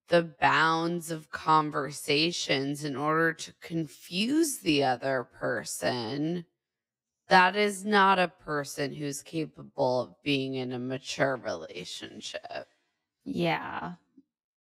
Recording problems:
wrong speed, natural pitch; too slow; 0.5 times normal speed

